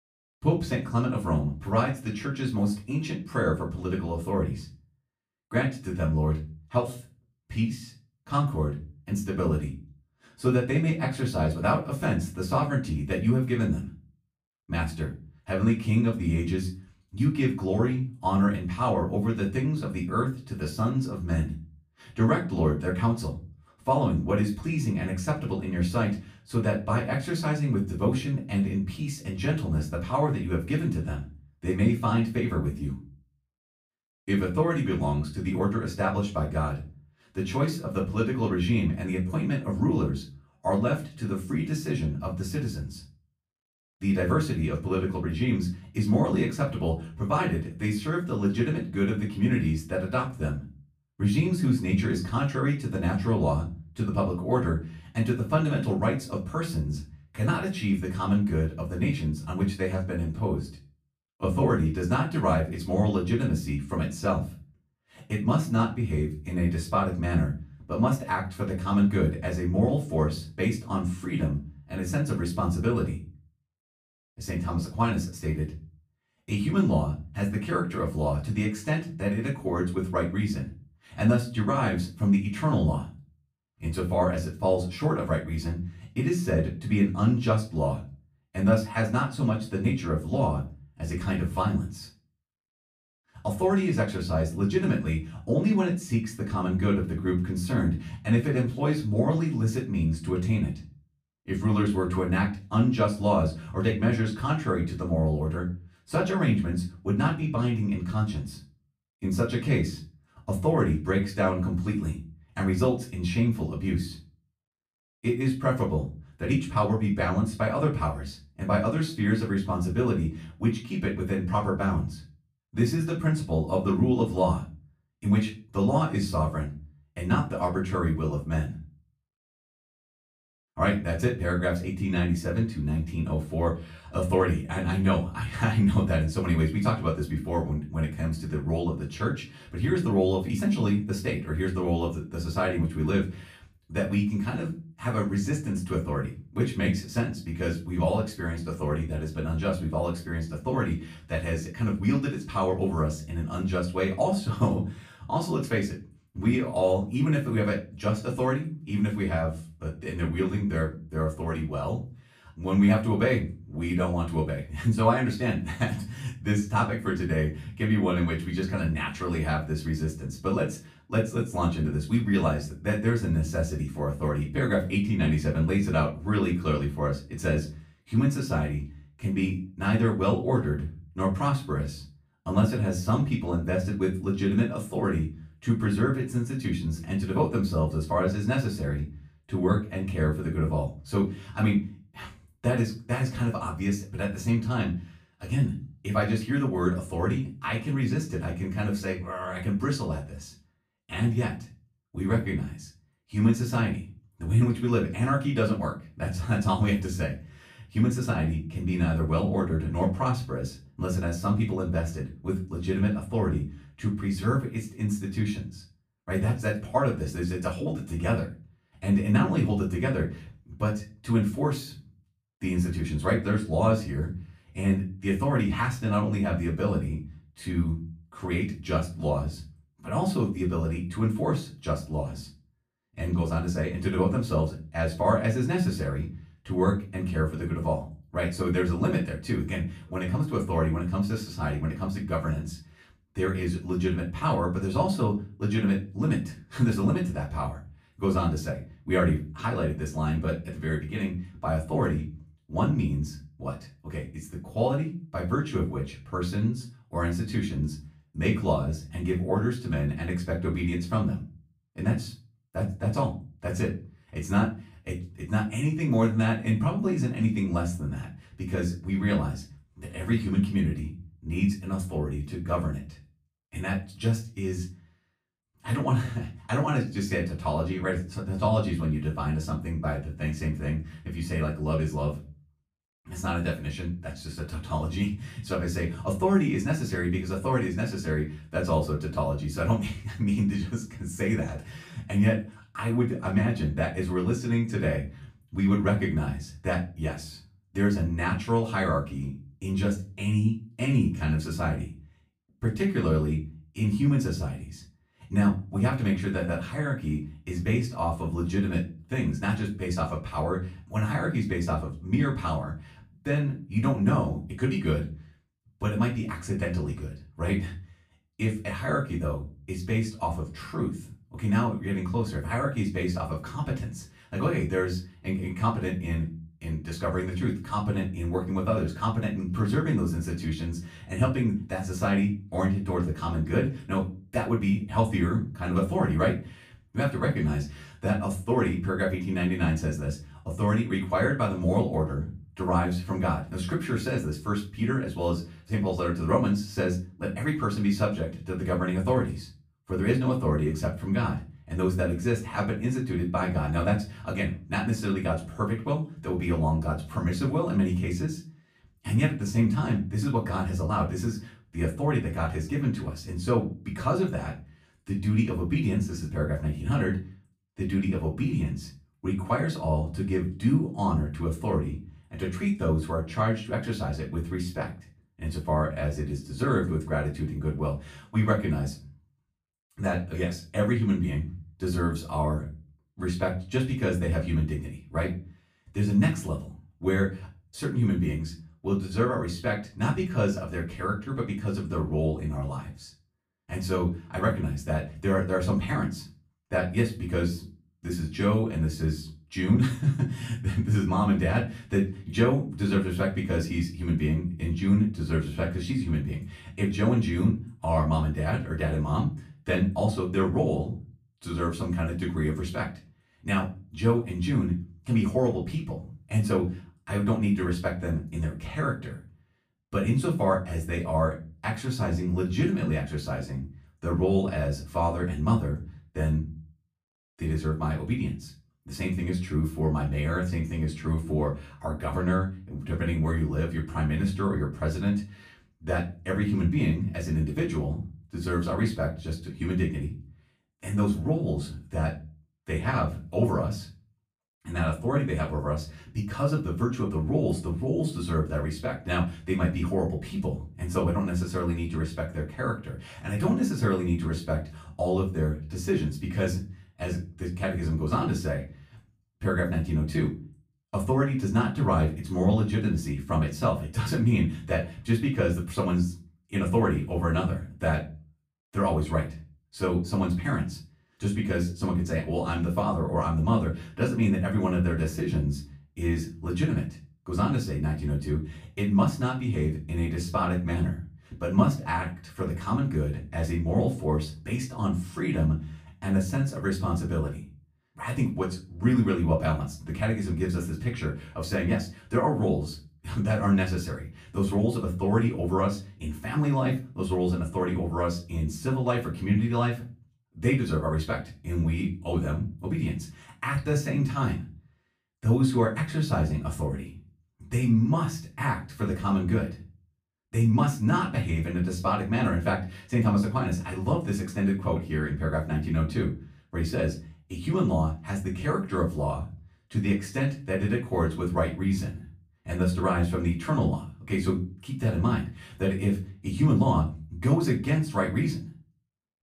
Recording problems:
off-mic speech; far
room echo; slight; dies away in 0.3 s

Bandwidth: 15 kHz